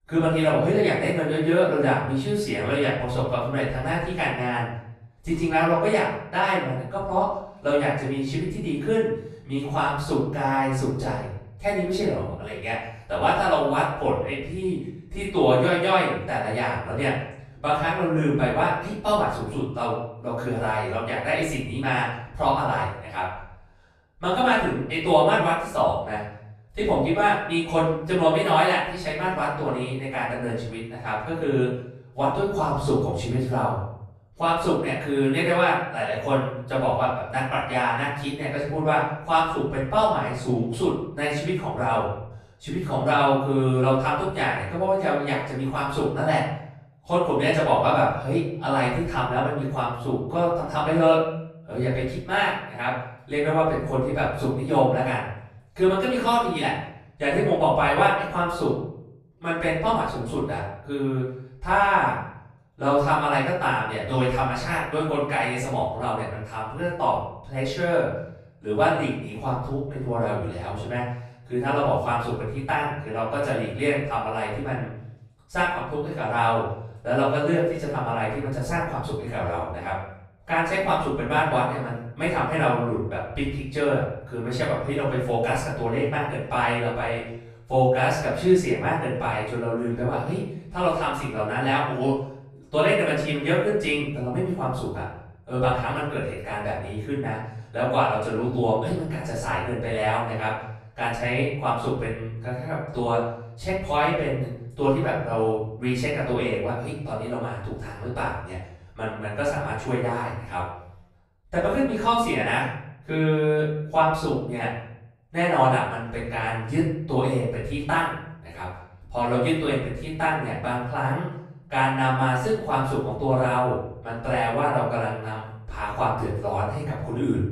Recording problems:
off-mic speech; far
room echo; noticeable; dies away in 0.7 s

